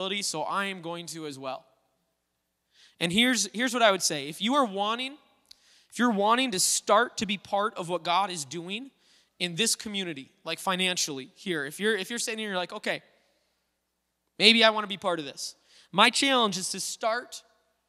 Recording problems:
abrupt cut into speech; at the start

